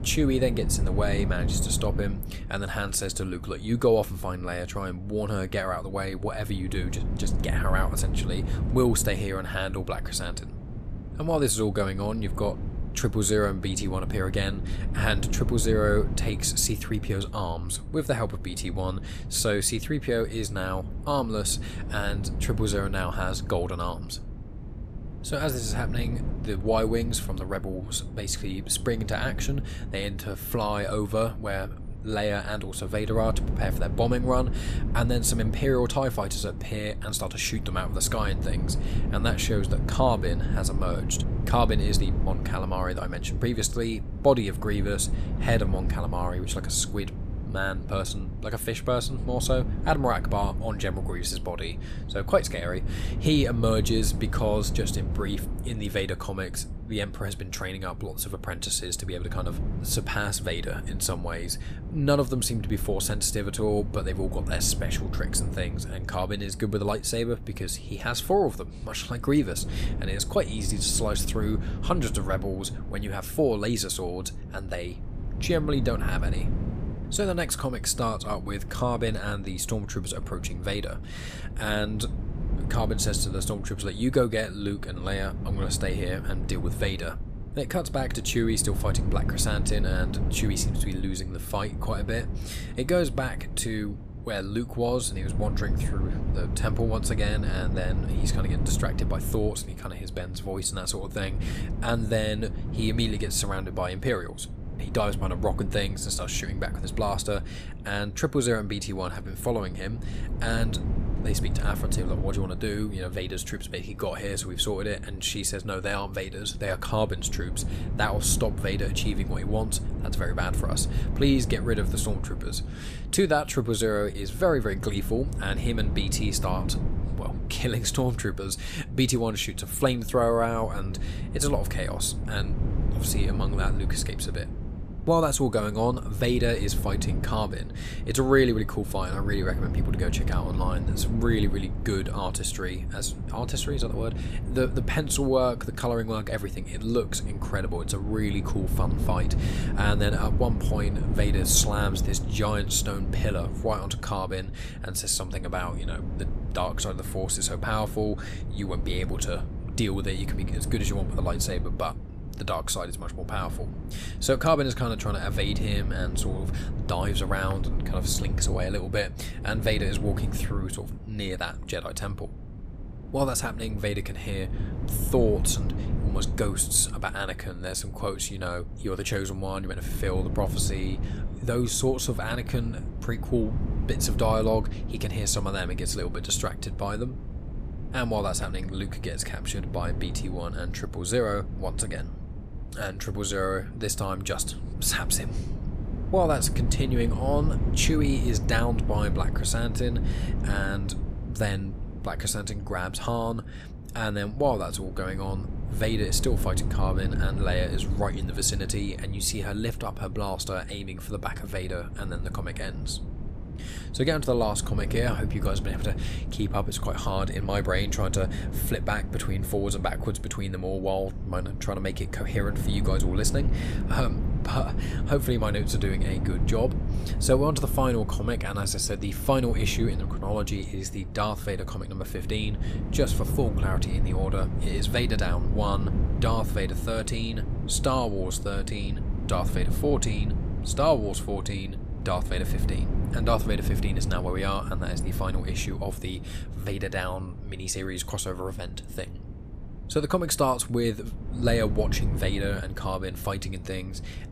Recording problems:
wind noise on the microphone; occasional gusts; 15 dB below the speech

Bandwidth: 14.5 kHz